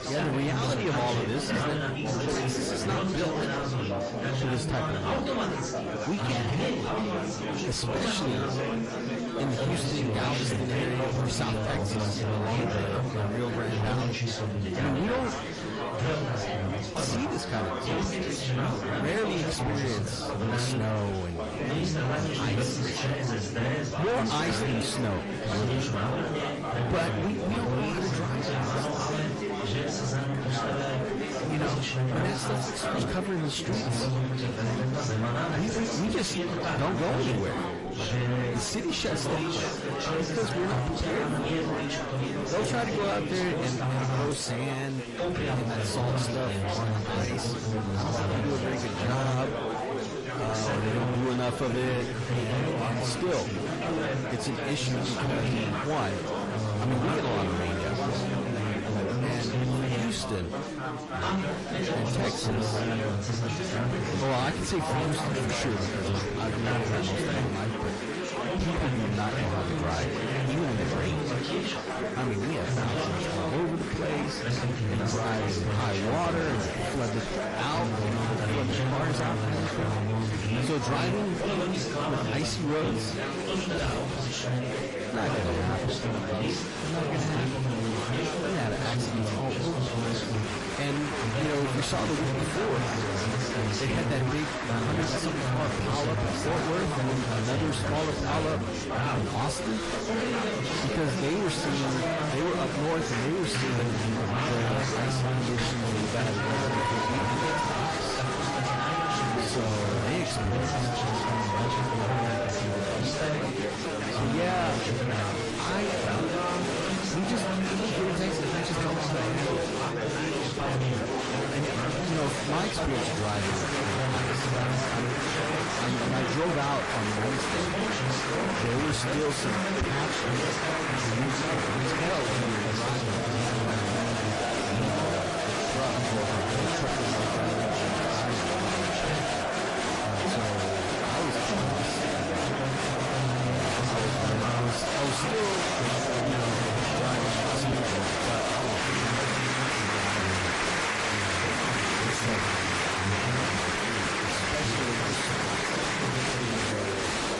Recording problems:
distortion; heavy; 8 dB below the speech
garbled, watery; slightly; nothing above 10.5 kHz
chatter from many people; very loud; throughout; 3 dB above the speech

